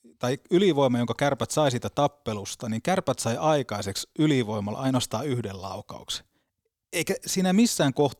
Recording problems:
none

